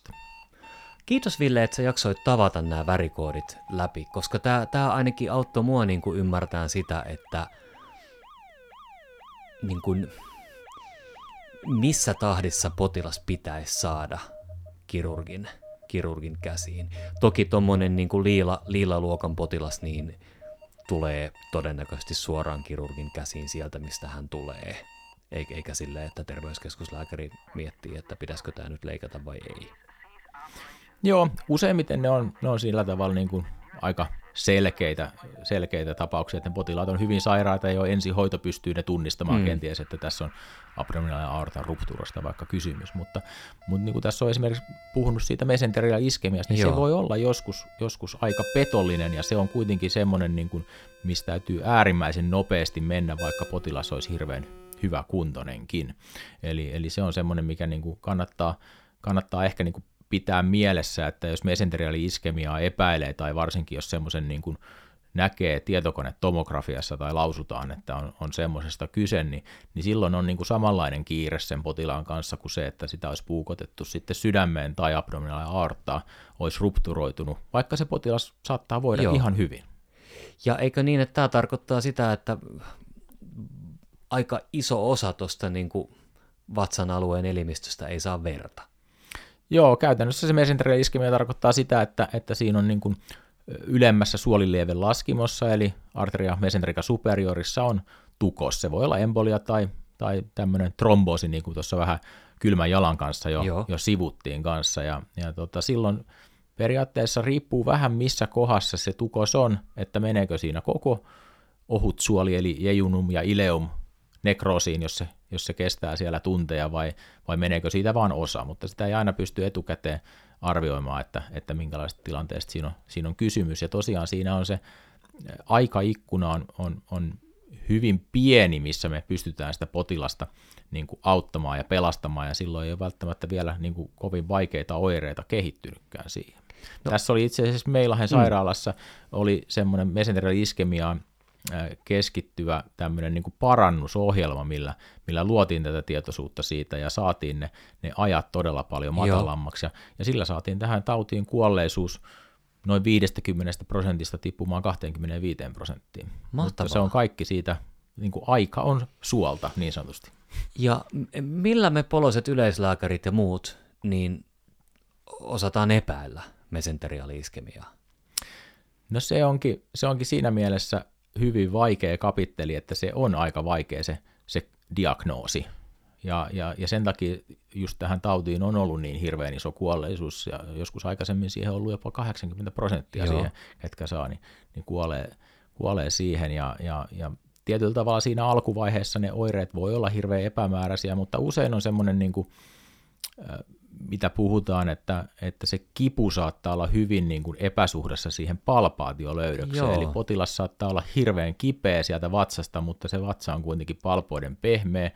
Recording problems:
alarms or sirens; noticeable; until 55 s; 20 dB below the speech

